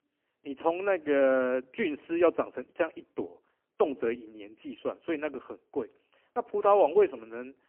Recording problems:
phone-call audio; poor line; nothing above 3 kHz

